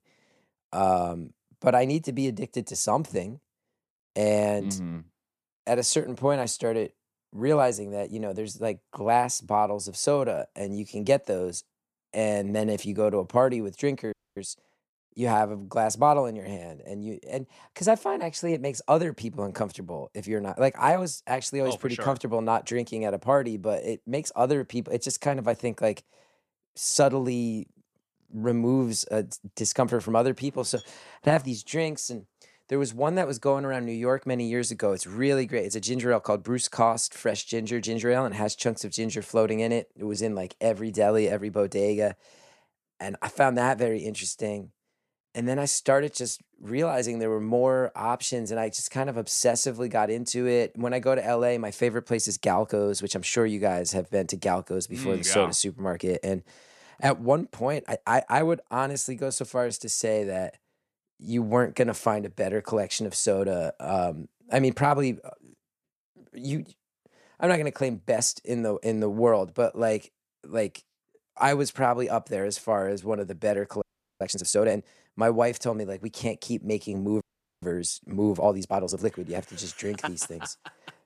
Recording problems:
audio freezing; at 14 s, at 1:14 and at 1:17

